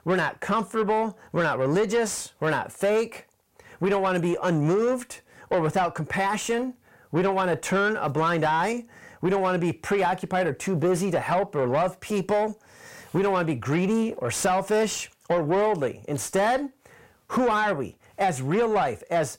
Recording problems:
distortion; slight; 10 dB below the speech

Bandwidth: 16 kHz